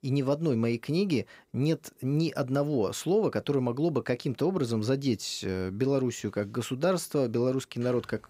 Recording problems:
none

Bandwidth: 15.5 kHz